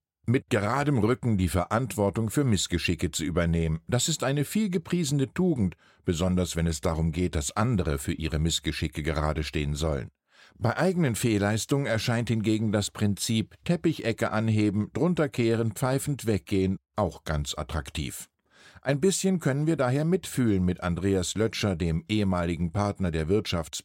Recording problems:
none

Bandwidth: 16 kHz